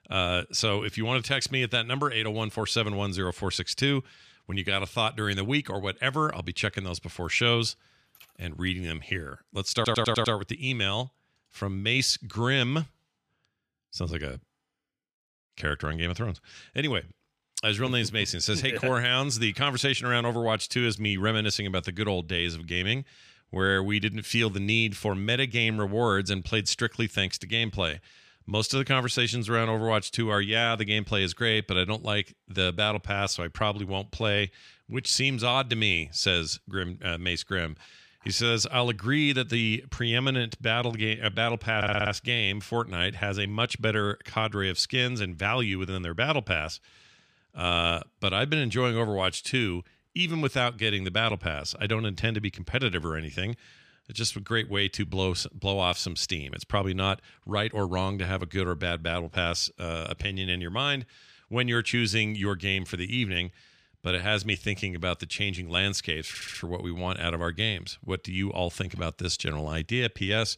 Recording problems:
audio stuttering; at 10 s, at 42 s and at 1:06

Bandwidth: 14.5 kHz